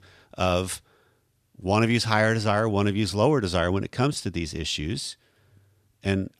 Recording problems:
none

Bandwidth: 14 kHz